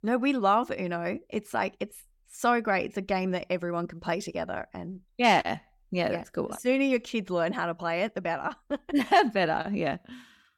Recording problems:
none

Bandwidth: 17 kHz